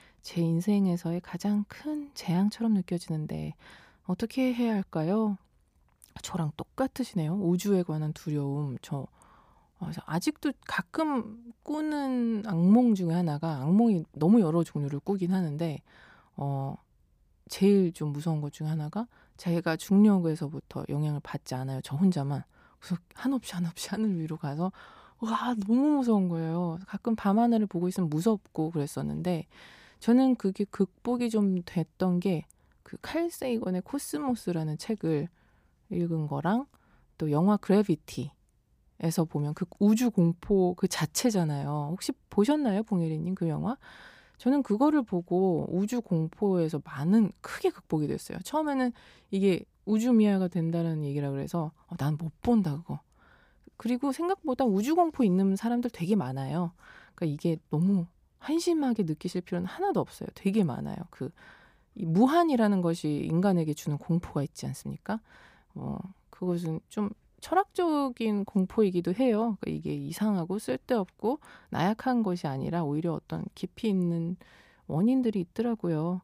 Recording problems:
none

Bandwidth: 15 kHz